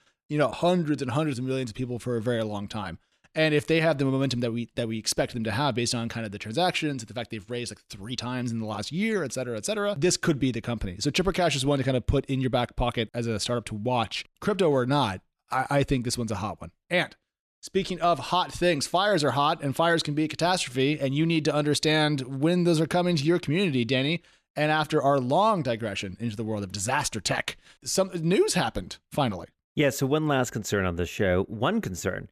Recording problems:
none

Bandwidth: 14.5 kHz